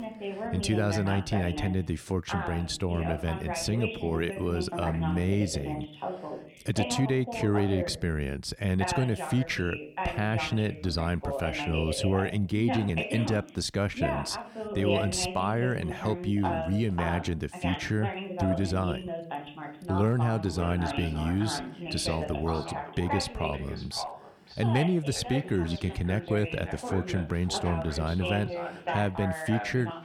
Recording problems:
echo of what is said; noticeable; from 20 s on; 560 ms later, 15 dB below the speech
voice in the background; loud; throughout; 6 dB below the speech

